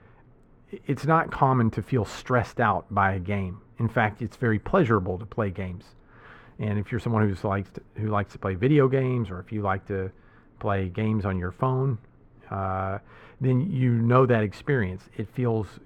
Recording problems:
muffled; very; fading above 3.5 kHz

